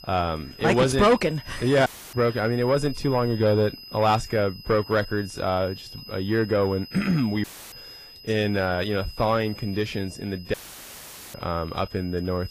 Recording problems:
distortion; slight; 10 dB below the speech
garbled, watery; slightly; nothing above 11 kHz
high-pitched whine; noticeable; throughout; 5 kHz, 15 dB below the speech
audio cutting out; filled with static; at 2 s, at 7.5 s and at 11 s for 1 s

